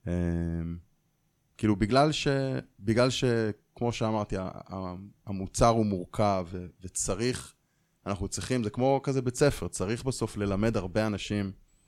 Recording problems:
none

